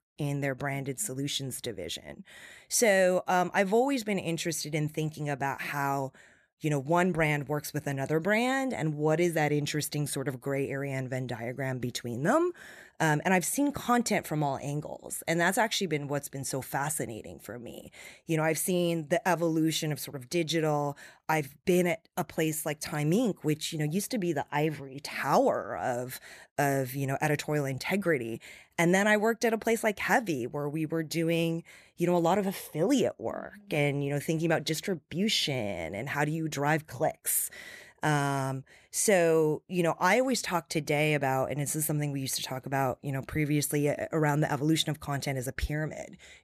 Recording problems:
none

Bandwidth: 14.5 kHz